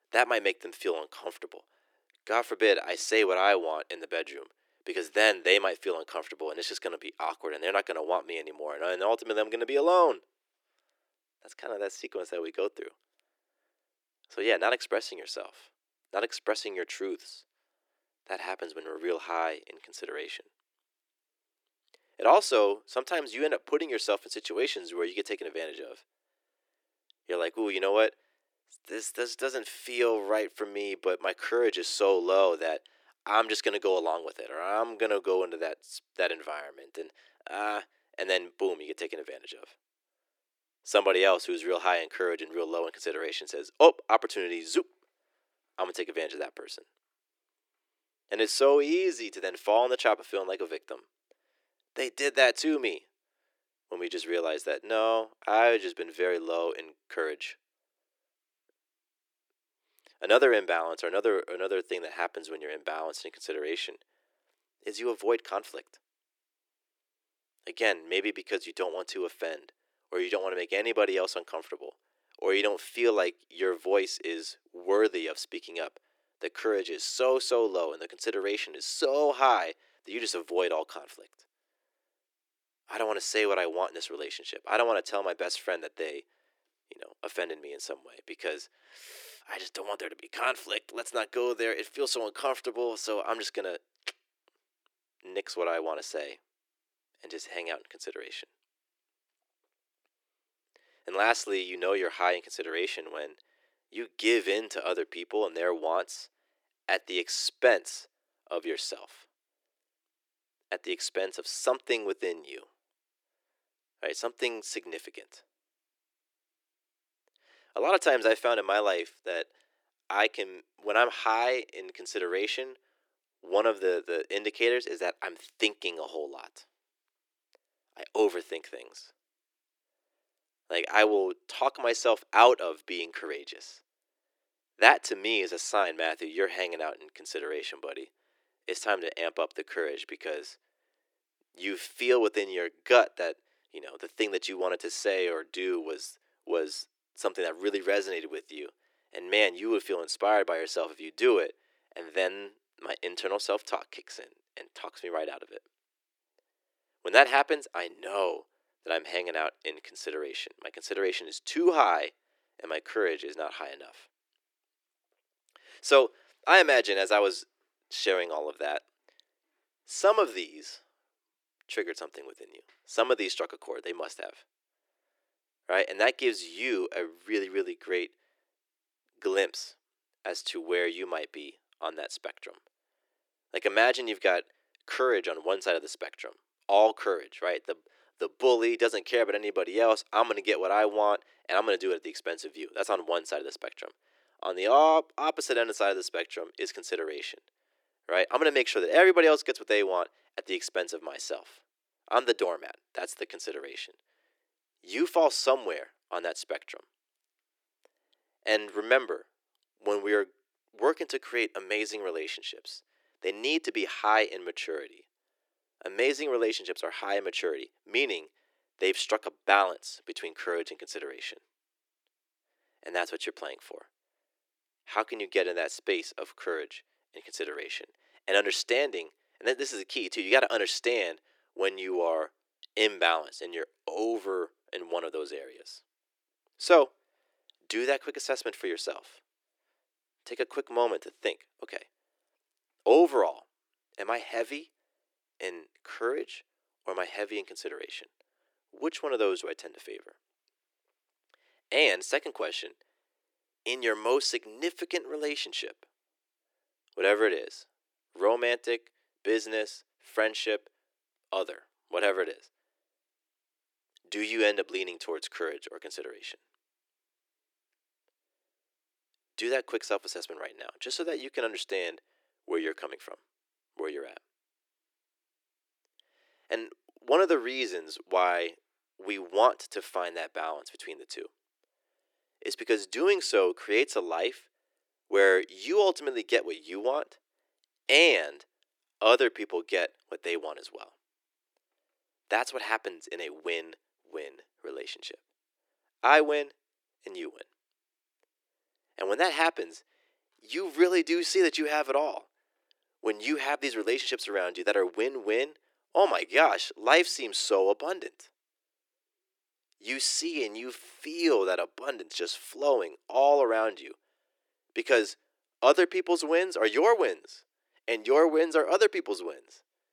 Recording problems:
thin; very; fading below 350 Hz

